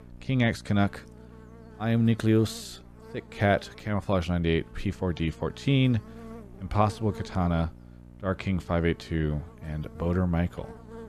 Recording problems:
electrical hum; faint; throughout; 60 Hz, 20 dB below the speech

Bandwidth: 13.5 kHz